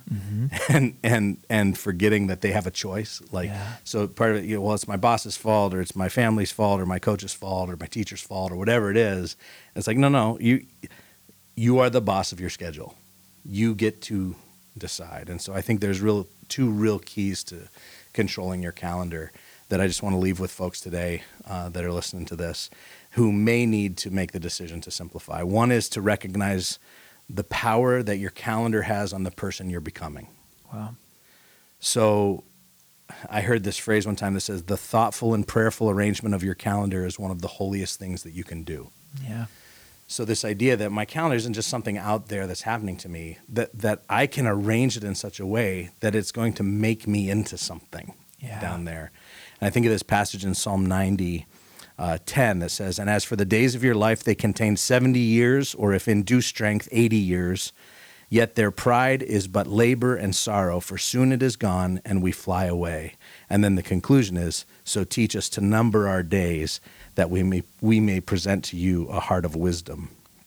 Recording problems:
hiss; faint; throughout; 30 dB below the speech

